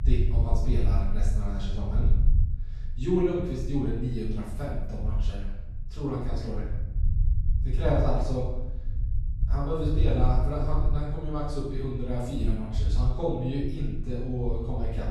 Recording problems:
room echo; strong; dies away in 0.8 s
off-mic speech; far
low rumble; noticeable; throughout; 15 dB below the speech

